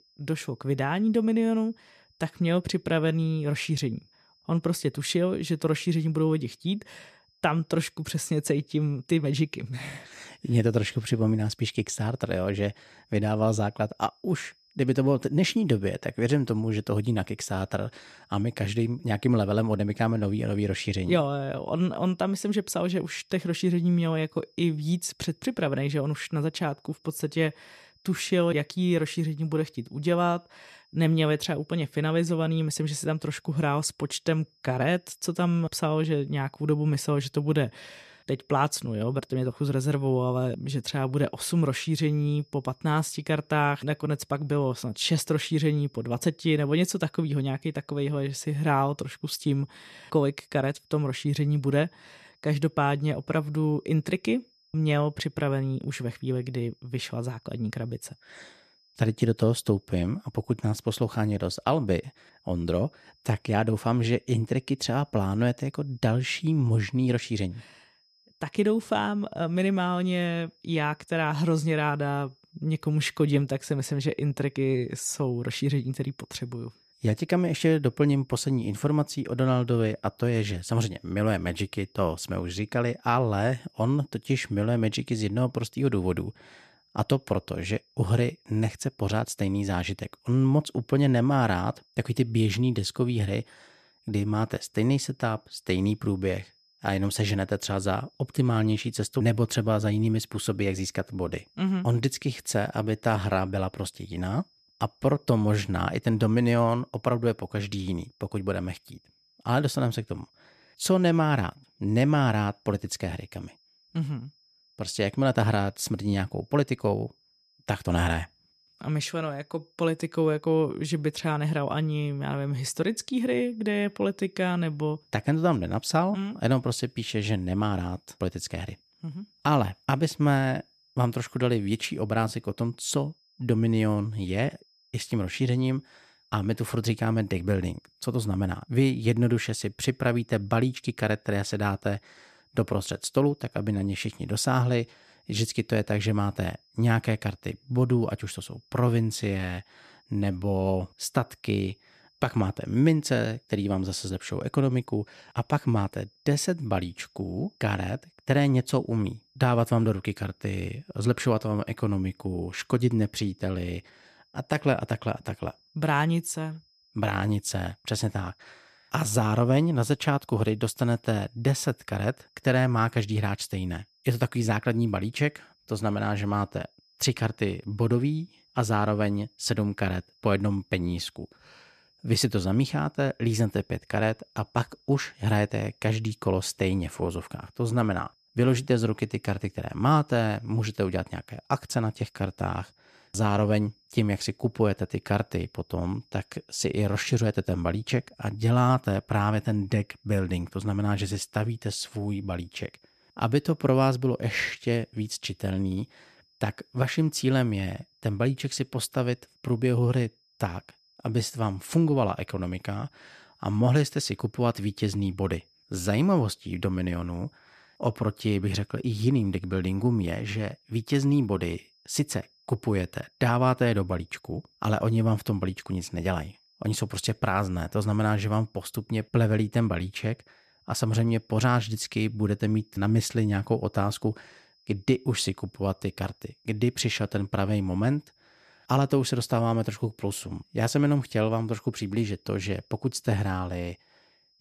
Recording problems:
high-pitched whine; faint; throughout; 5 kHz, 35 dB below the speech

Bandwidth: 14 kHz